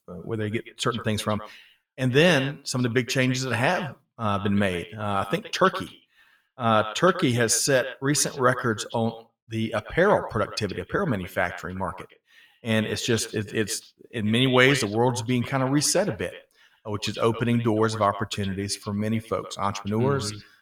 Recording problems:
echo of what is said; noticeable; throughout; 120 ms later, 15 dB below the speech

